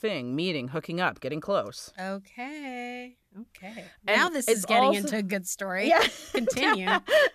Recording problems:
none

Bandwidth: 14 kHz